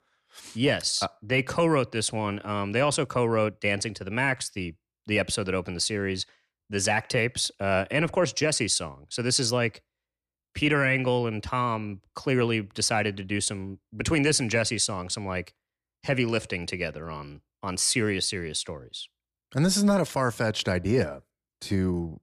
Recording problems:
none

